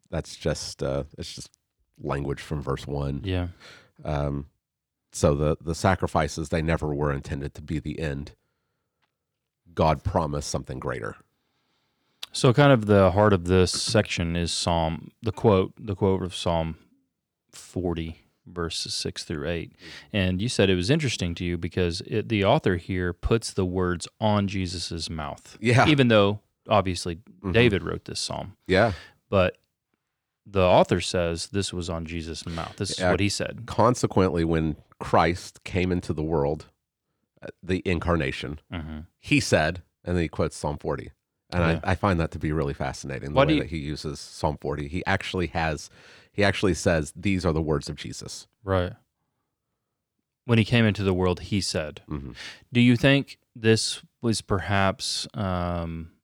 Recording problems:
none

